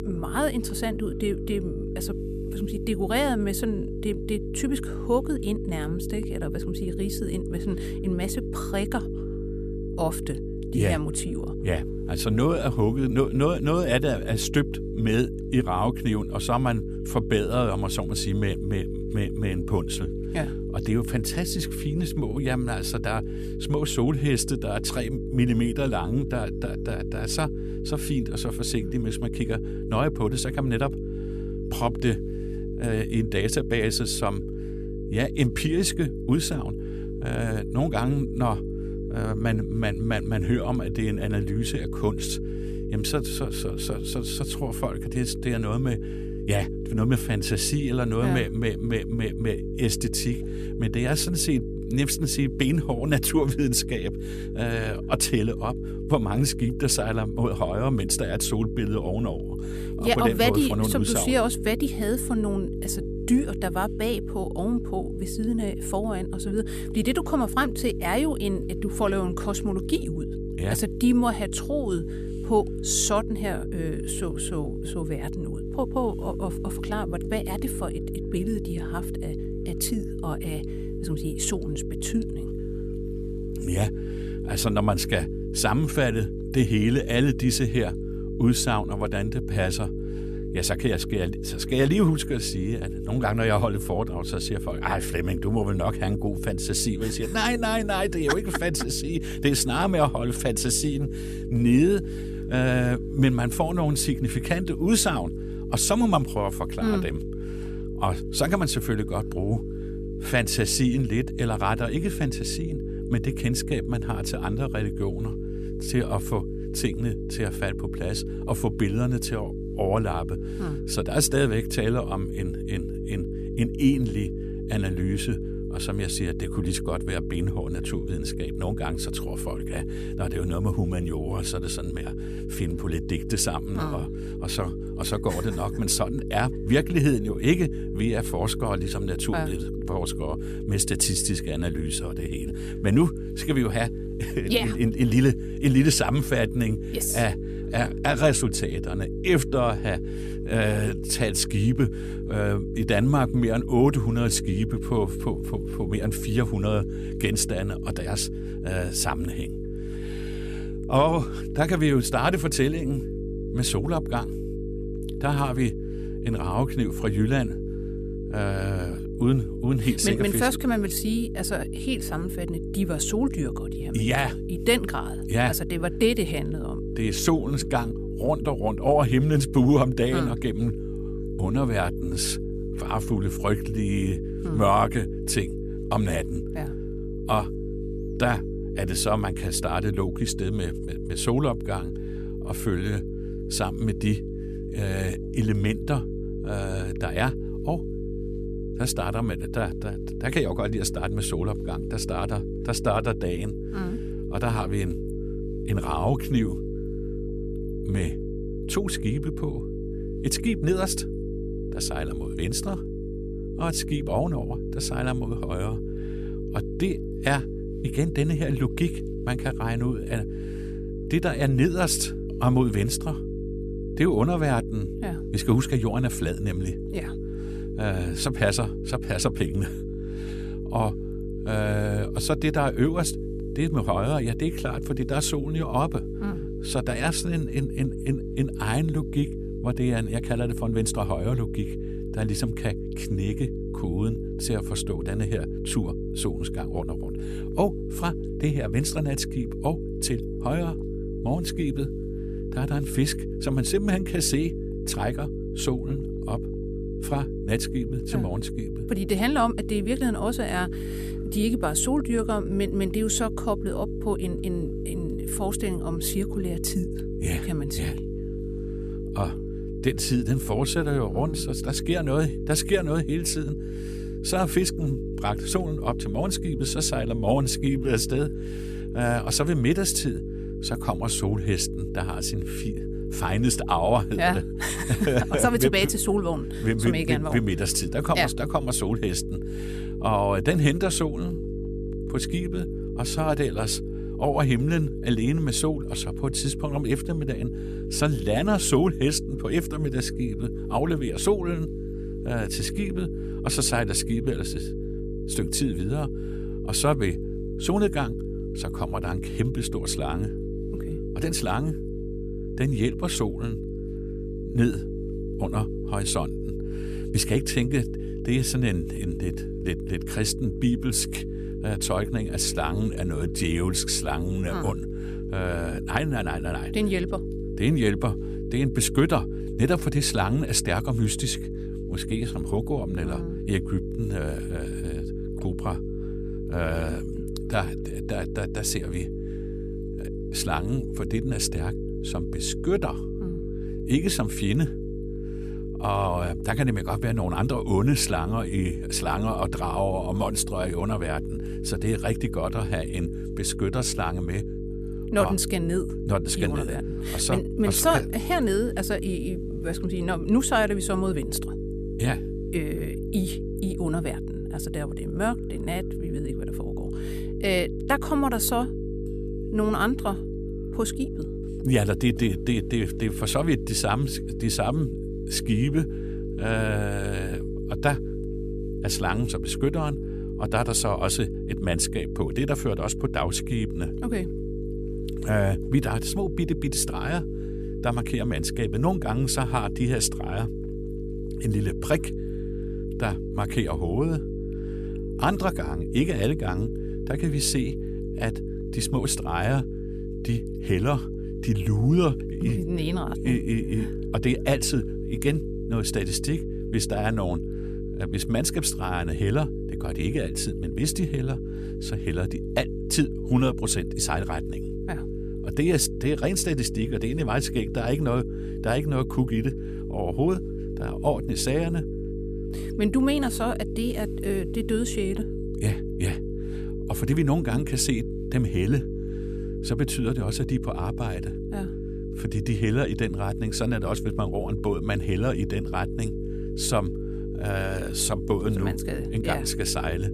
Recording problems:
electrical hum; loud; throughout; 50 Hz, 8 dB below the speech

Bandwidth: 14.5 kHz